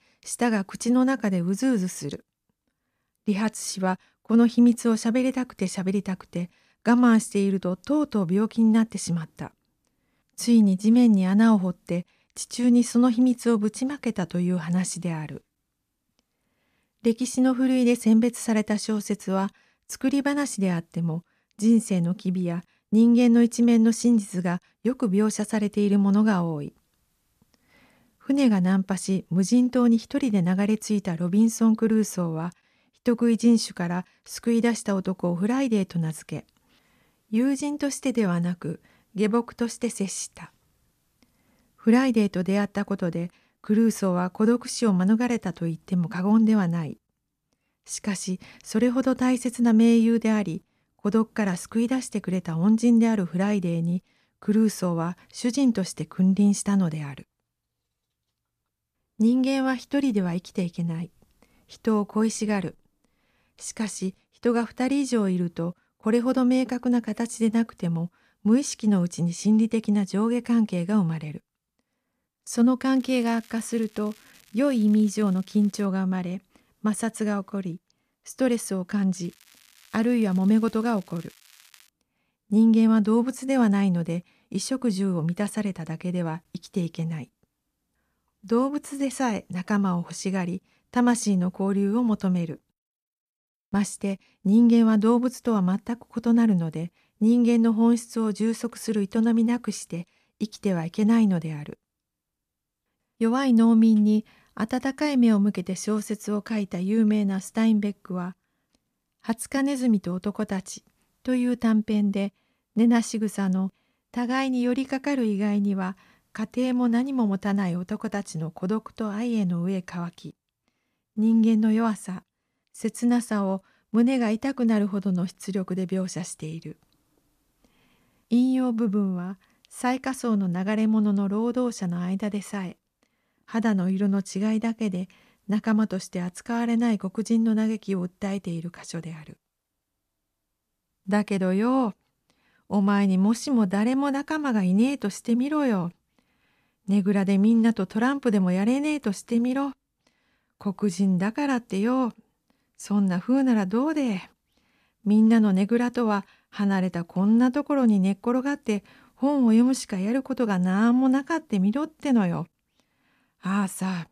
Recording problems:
crackling; faint; from 1:13 to 1:16 and from 1:19 to 1:22; 30 dB below the speech

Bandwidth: 14.5 kHz